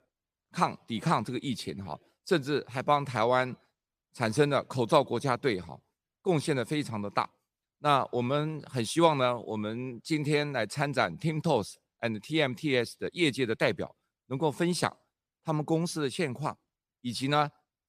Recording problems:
none

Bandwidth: 15 kHz